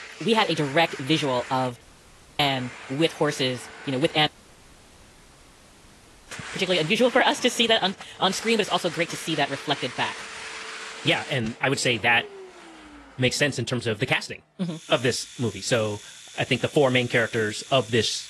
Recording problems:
wrong speed, natural pitch; too fast; 1.5 times normal speed
garbled, watery; slightly; nothing above 11.5 kHz
household noises; noticeable; throughout; 15 dB below the speech
audio cutting out; at 2 s for 0.5 s and at 4.5 s for 2 s

